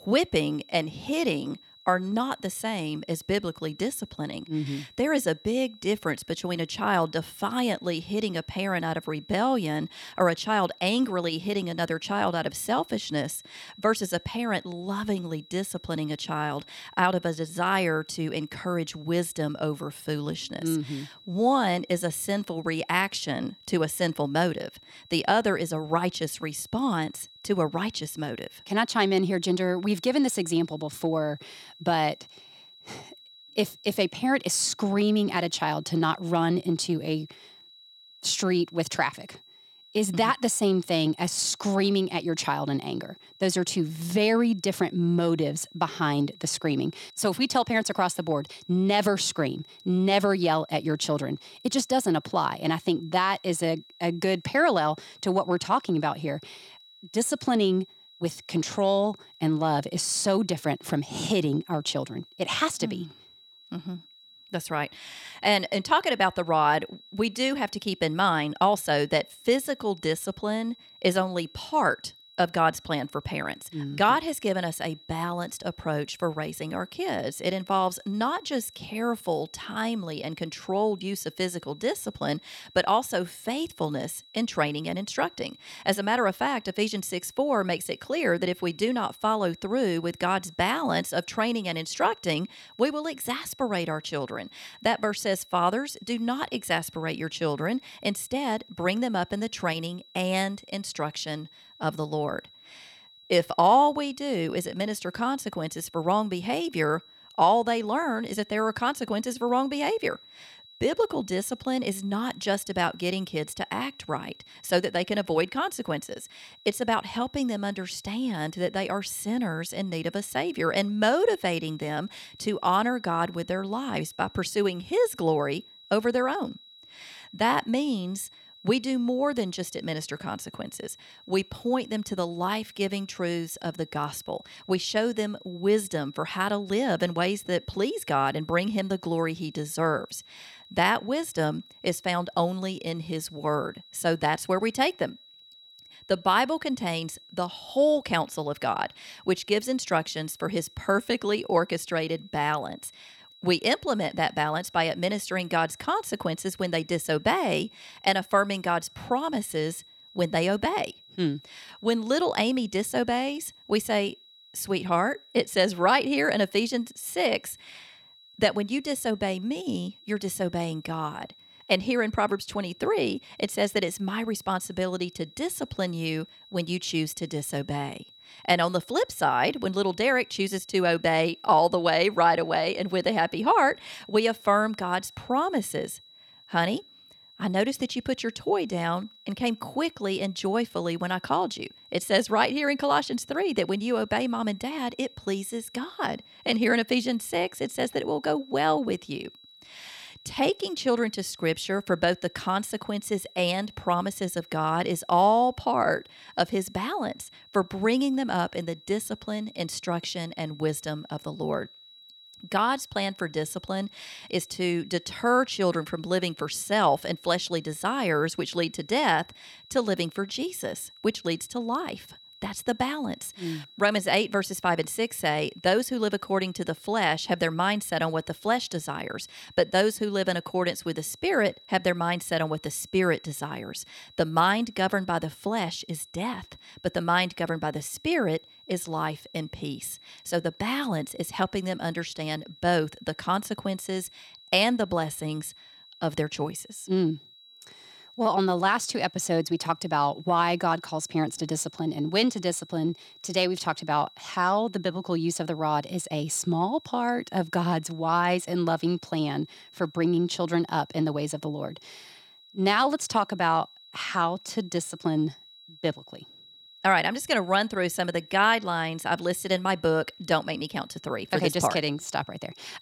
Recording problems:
high-pitched whine; faint; throughout; 4 kHz, 25 dB below the speech

